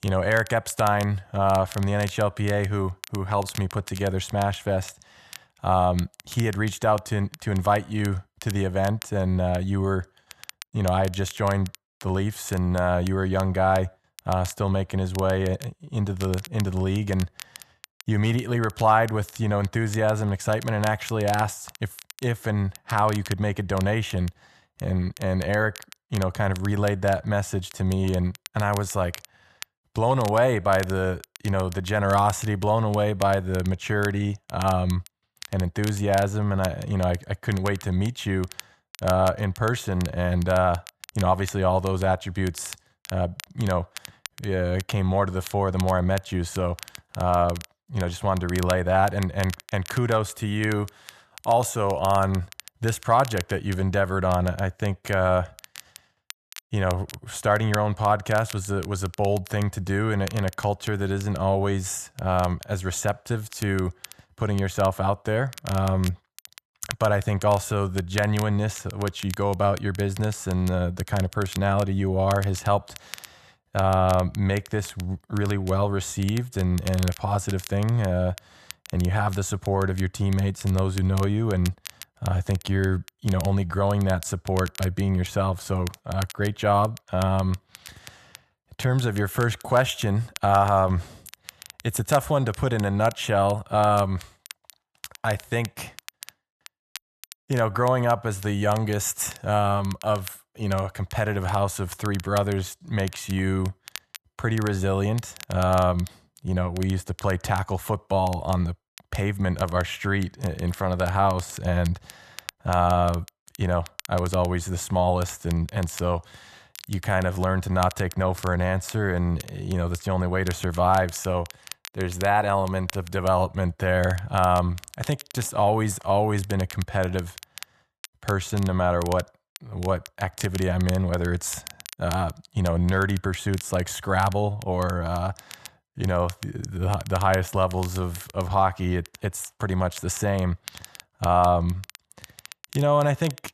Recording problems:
crackle, like an old record; noticeable; 20 dB below the speech

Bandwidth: 13.5 kHz